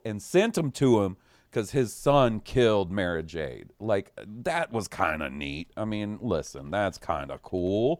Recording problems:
none

